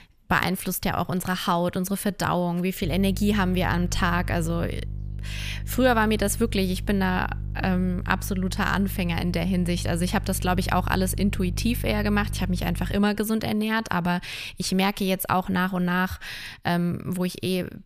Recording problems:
electrical hum; faint; from 3 to 13 s; 50 Hz, 20 dB below the speech

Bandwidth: 15 kHz